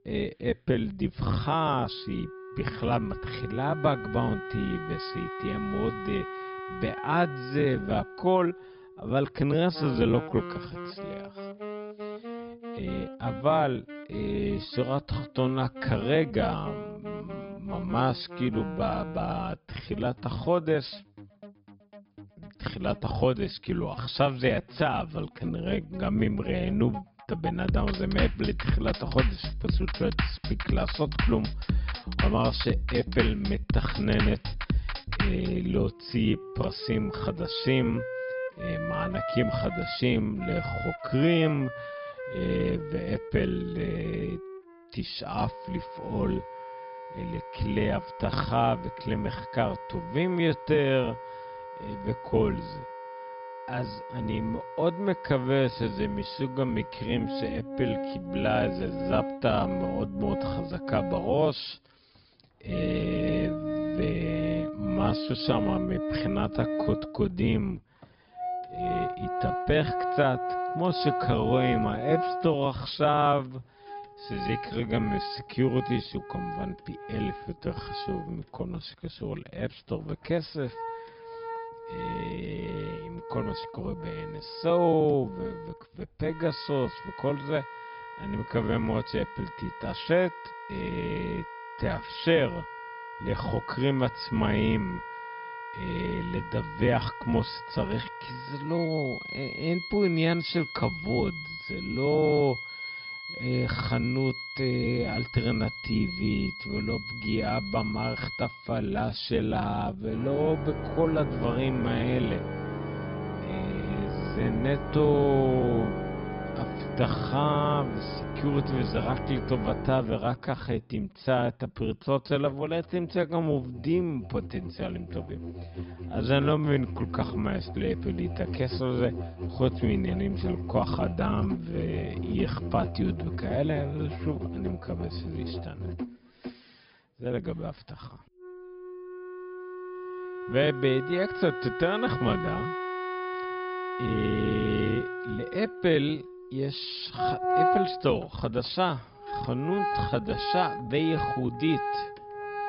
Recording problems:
wrong speed, natural pitch; too slow; 0.6 times normal speed
high frequencies cut off; noticeable; nothing above 5.5 kHz
background music; loud; throughout; 6 dB below the speech

